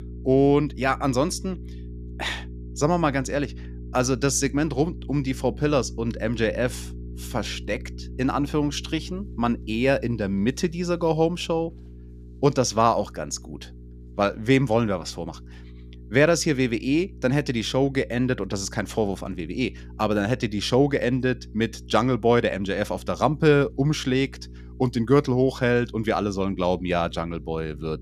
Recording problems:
electrical hum; faint; throughout; 60 Hz, 25 dB below the speech

